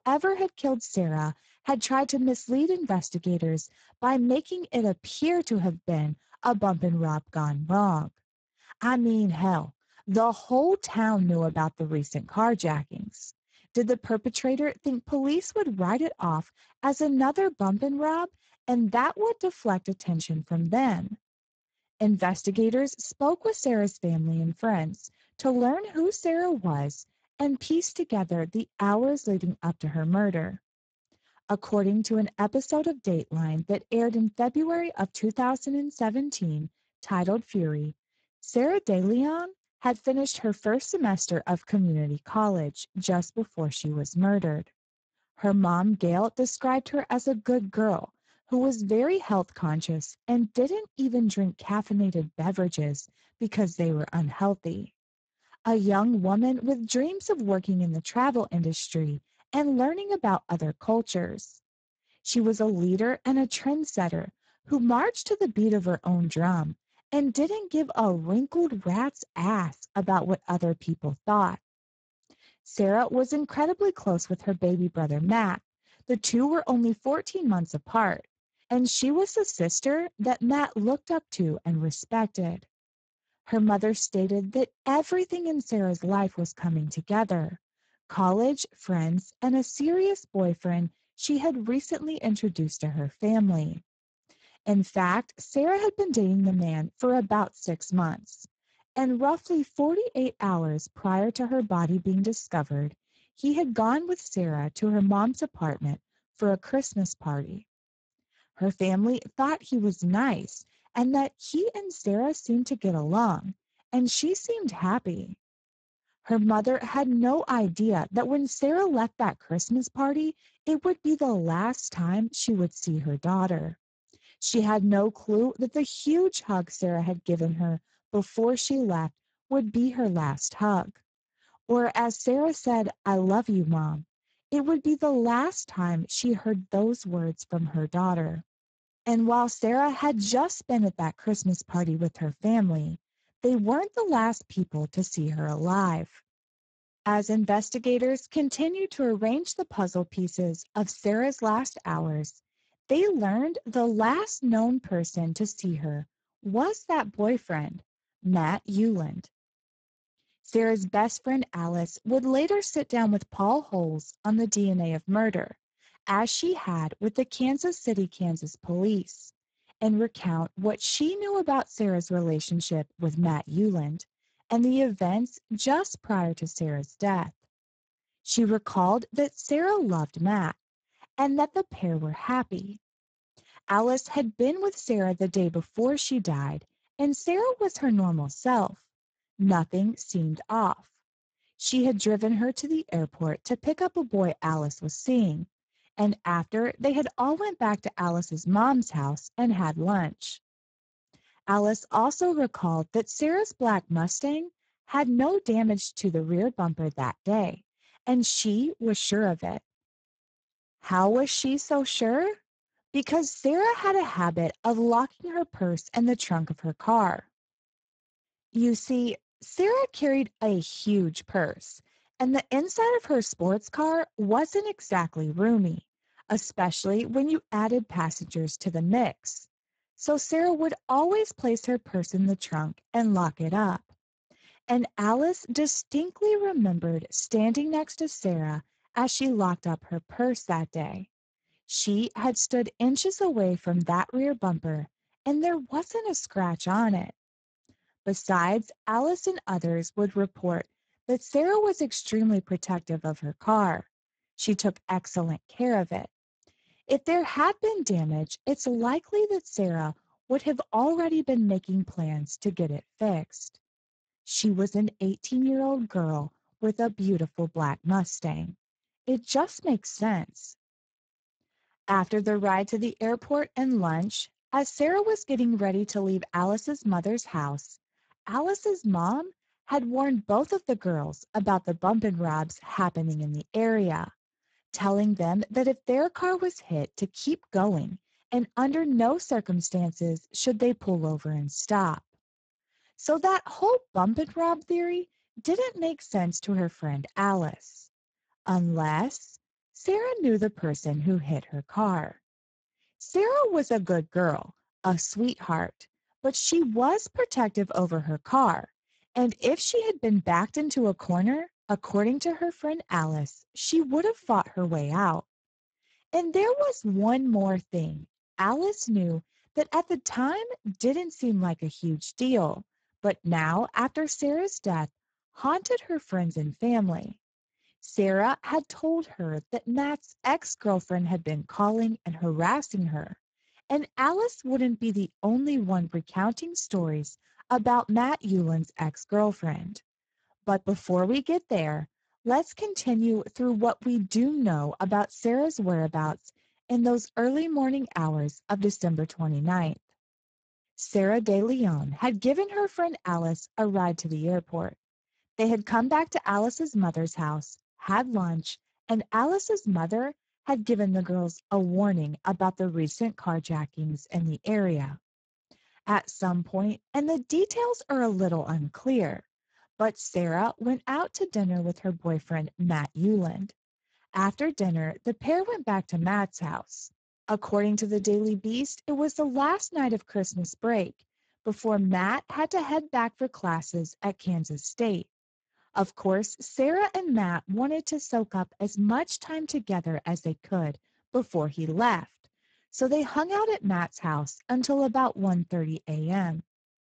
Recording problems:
garbled, watery; badly; nothing above 7.5 kHz

